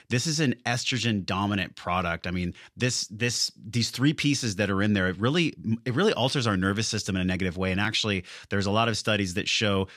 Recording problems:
none

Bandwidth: 14 kHz